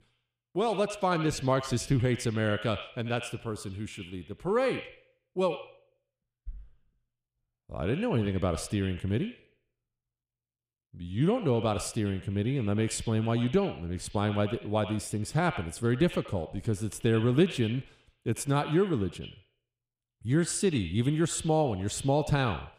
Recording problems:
echo of what is said; noticeable; throughout; 80 ms later, 15 dB below the speech

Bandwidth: 15 kHz